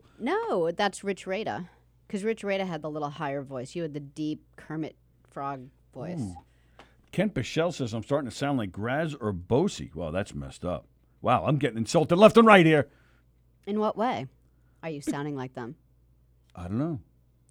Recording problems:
none

